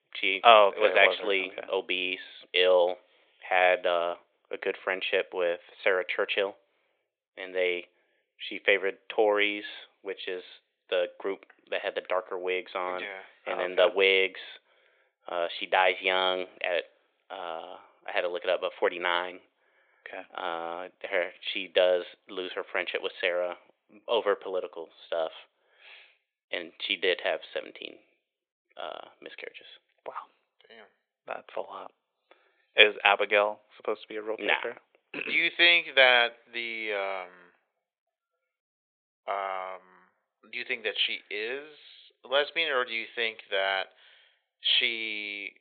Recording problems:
thin; very; fading below 450 Hz
high frequencies cut off; severe; nothing above 4 kHz

